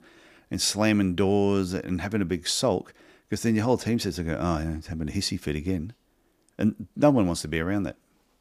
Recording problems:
none

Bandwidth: 15 kHz